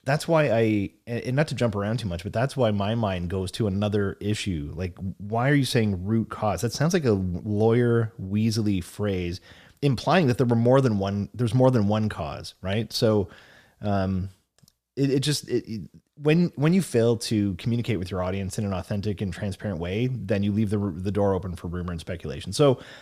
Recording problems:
none

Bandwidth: 14.5 kHz